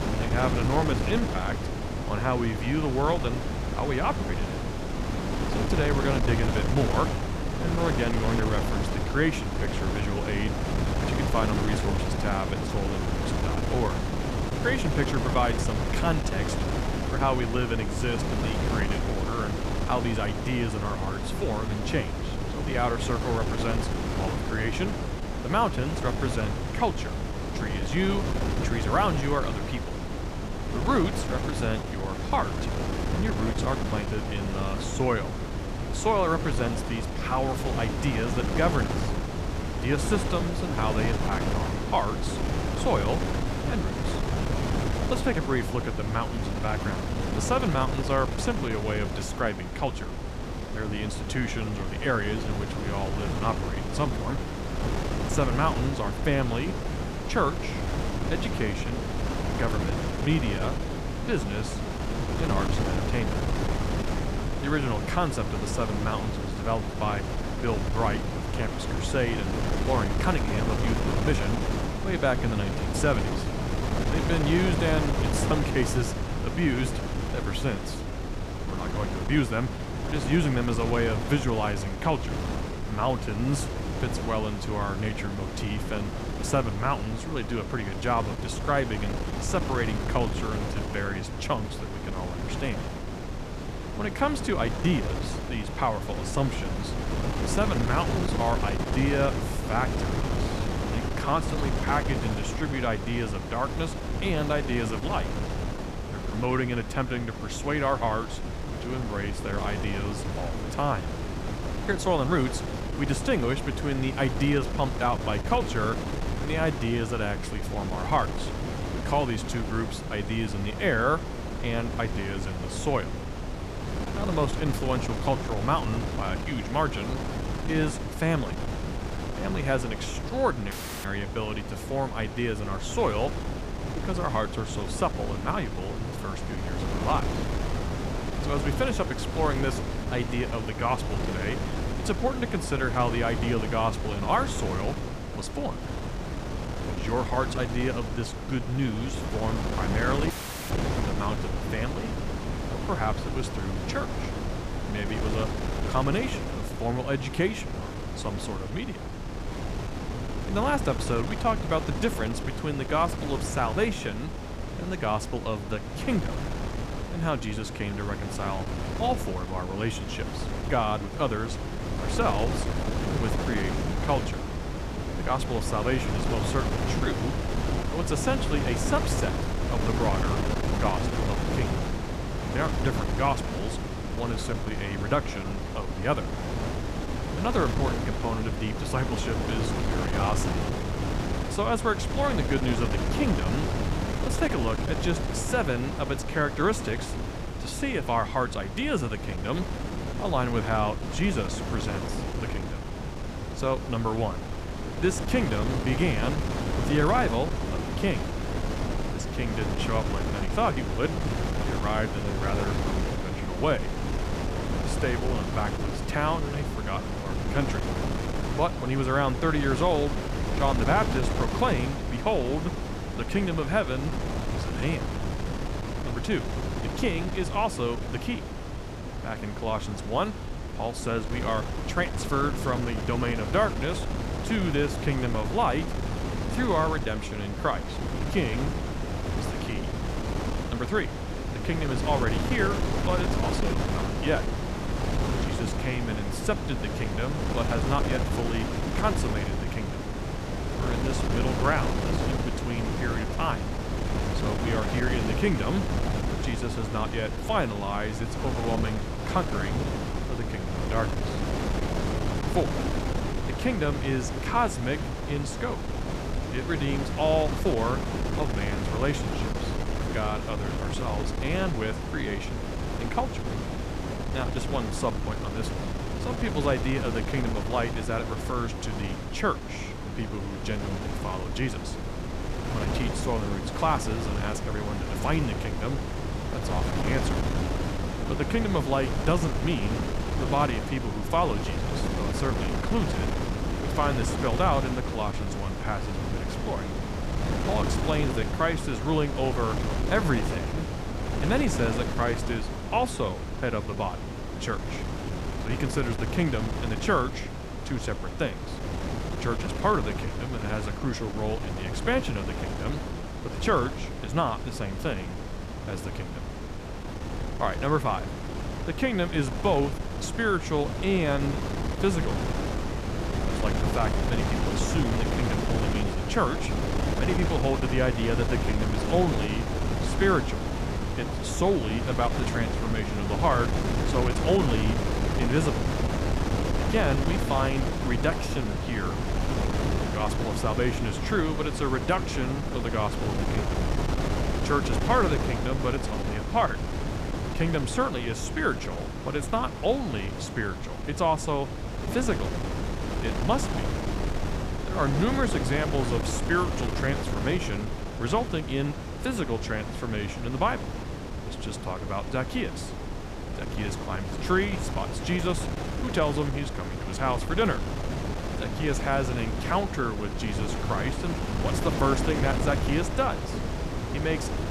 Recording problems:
wind noise on the microphone; heavy; 4 dB below the speech
audio cutting out; at 2:11 and at 2:30

